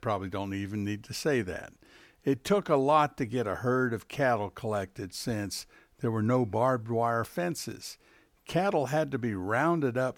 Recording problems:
none

